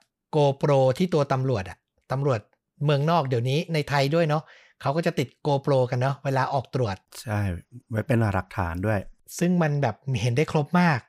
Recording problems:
none

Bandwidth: 15.5 kHz